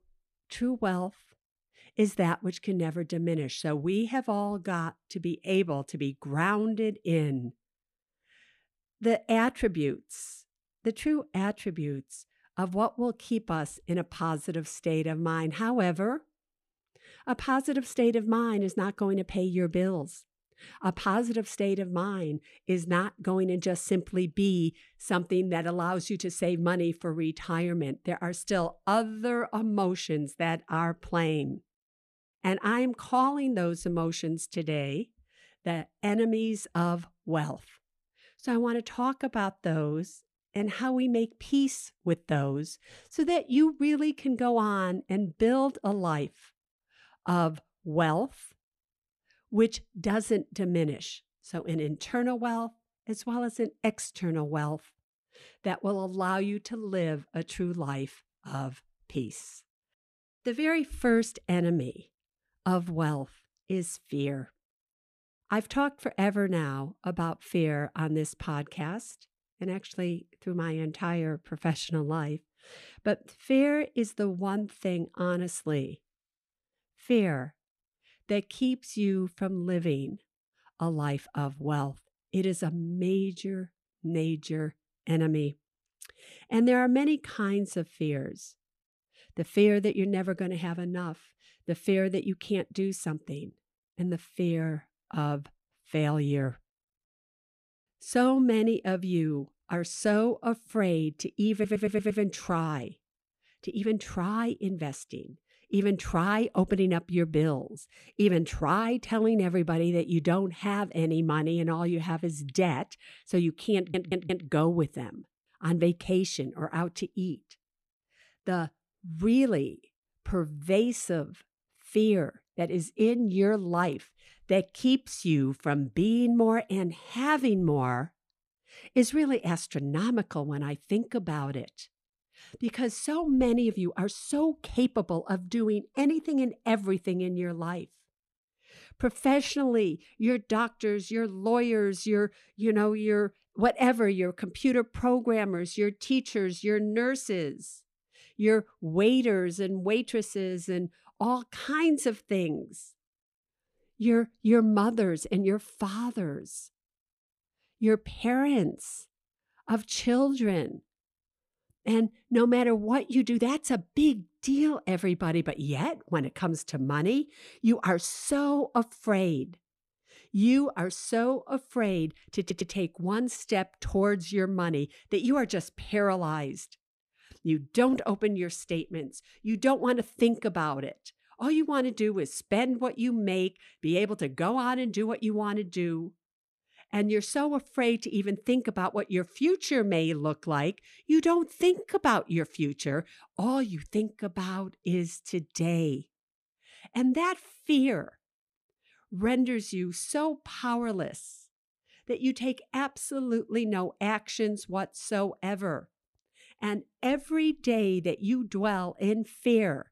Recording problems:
audio stuttering; at 1:42, at 1:54 and at 2:52

